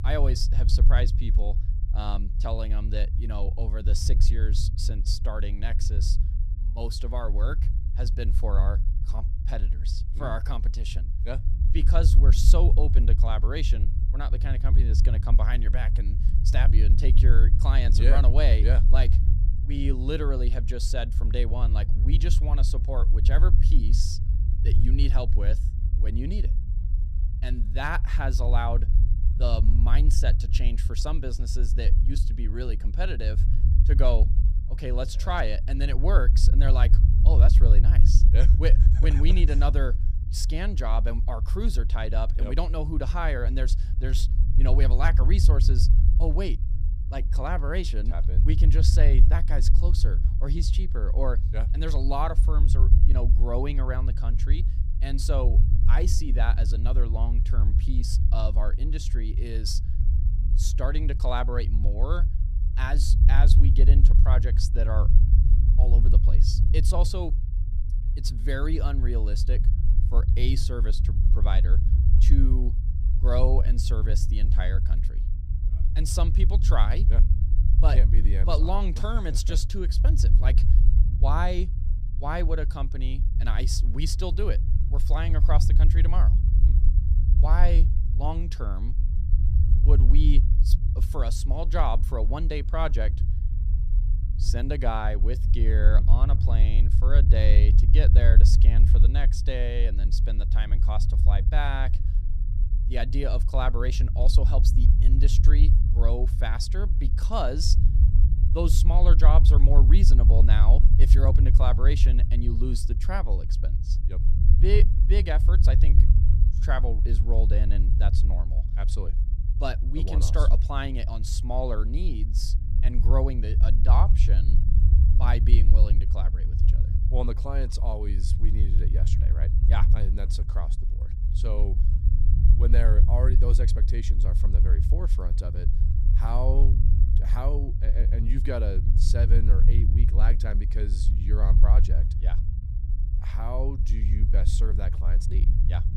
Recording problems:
low rumble; loud; throughout; 8 dB below the speech

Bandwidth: 15 kHz